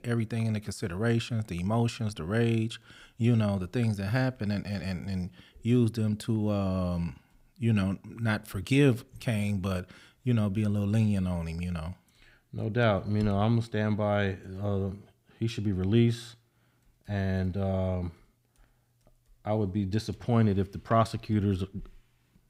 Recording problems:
none

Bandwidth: 15.5 kHz